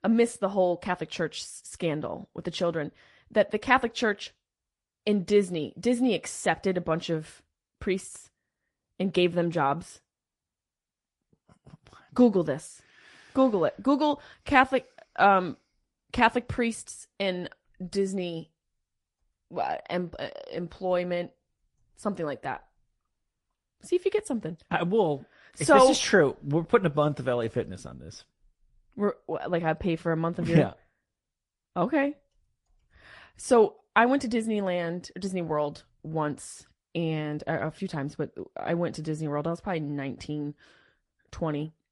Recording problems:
garbled, watery; slightly; nothing above 11 kHz

